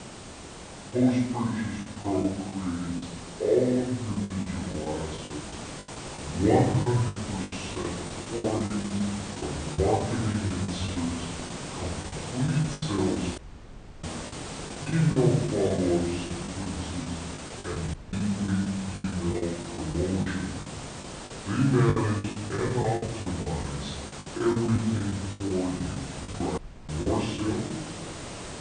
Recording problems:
off-mic speech; far
wrong speed and pitch; too slow and too low; 0.6 times normal speed
room echo; noticeable; dies away in 0.9 s
hiss; loud; throughout; 9 dB below the speech
choppy; very; 13% of the speech affected
audio cutting out; at 13 s for 0.5 s, at 18 s and at 27 s

